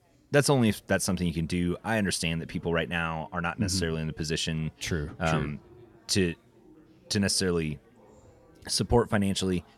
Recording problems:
chatter from many people; faint; throughout; 30 dB below the speech

